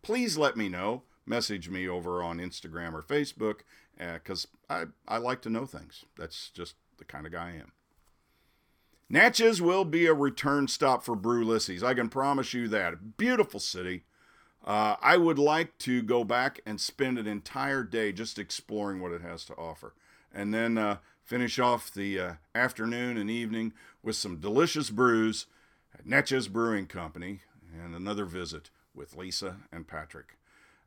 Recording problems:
none

